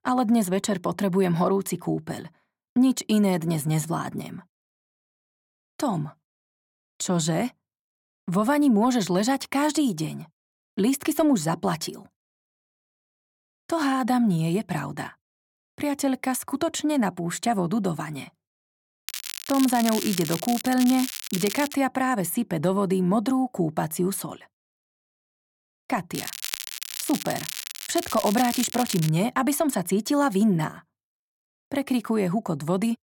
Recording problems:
crackling; loud; from 19 to 22 s and from 26 to 29 s; 7 dB below the speech

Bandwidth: 17.5 kHz